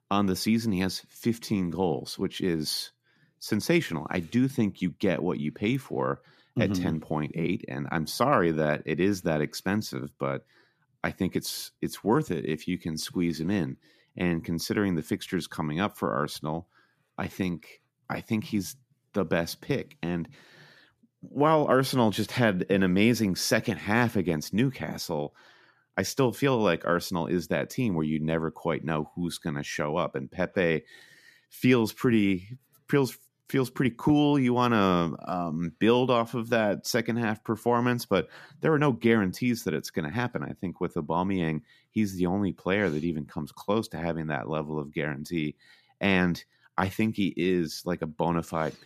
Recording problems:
none

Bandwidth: 14.5 kHz